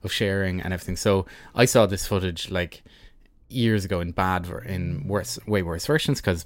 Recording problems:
low rumble; faint; throughout; 25 dB below the speech

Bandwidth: 16 kHz